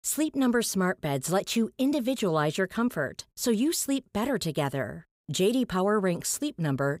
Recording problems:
none

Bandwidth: 15.5 kHz